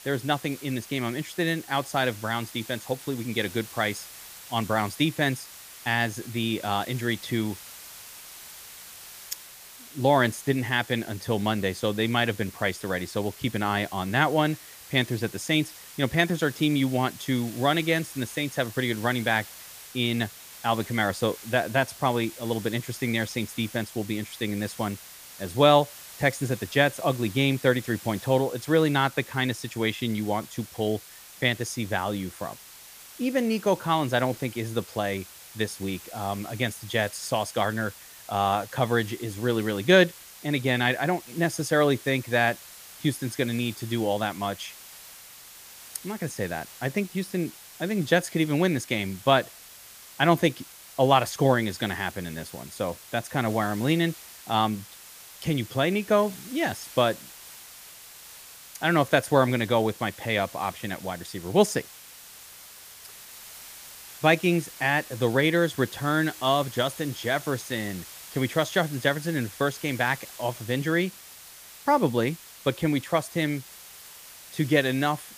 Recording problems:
hiss; noticeable; throughout; 15 dB below the speech

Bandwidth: 15 kHz